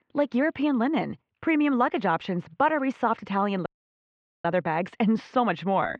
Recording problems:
muffled; very; fading above 3 kHz
audio cutting out; at 3.5 s for 1 s

